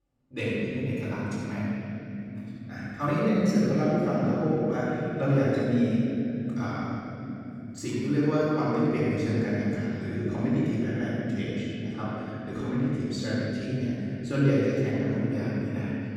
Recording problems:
room echo; strong; dies away in 3 s
off-mic speech; far

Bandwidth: 17 kHz